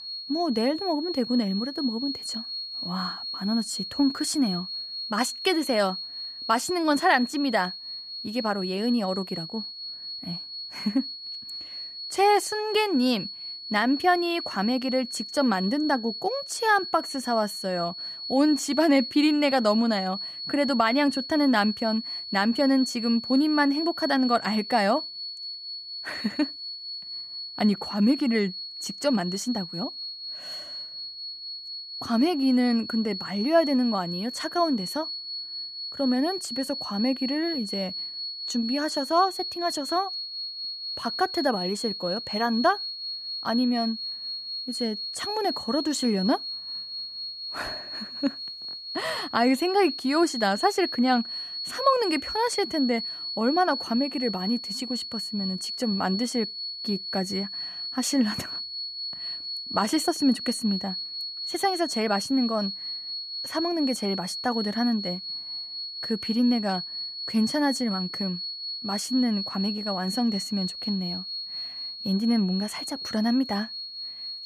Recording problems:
high-pitched whine; loud; throughout; 4.5 kHz, 6 dB below the speech

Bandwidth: 14.5 kHz